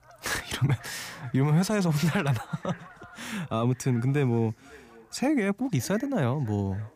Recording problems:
echo of what is said; faint; throughout; 550 ms later, 25 dB below the speech
animal sounds; faint; throughout; 25 dB below the speech

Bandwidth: 15 kHz